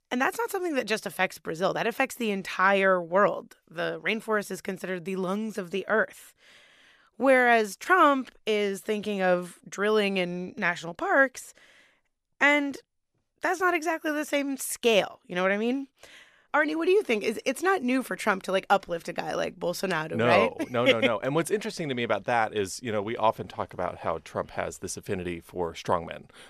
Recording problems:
none

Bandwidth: 14.5 kHz